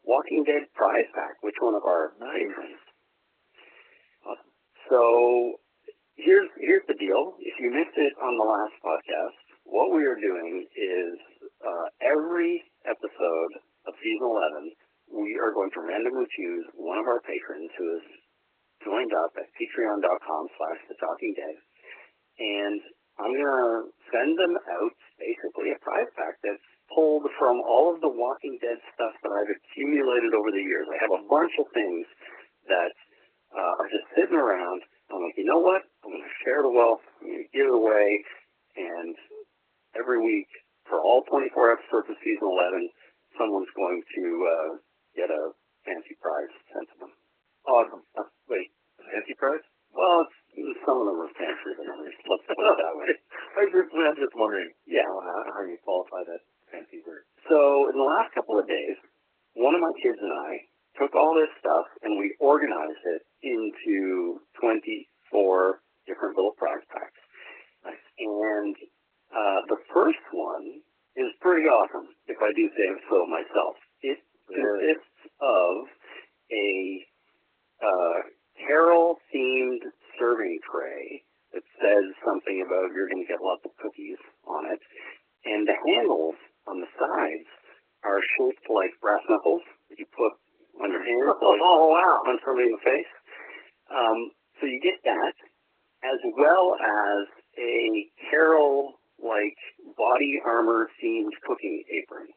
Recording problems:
garbled, watery; badly
phone-call audio; nothing above 3 kHz

